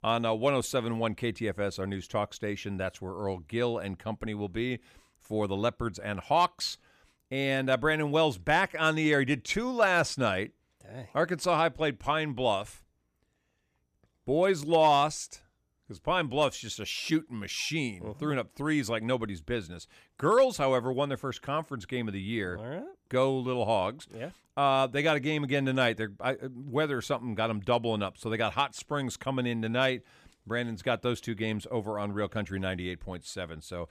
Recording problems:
none

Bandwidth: 14.5 kHz